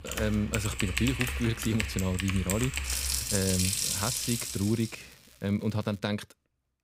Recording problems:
household noises; very loud; until 4.5 s; as loud as the speech
crackling; faint; from 3.5 to 6 s; 25 dB below the speech

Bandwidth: 15.5 kHz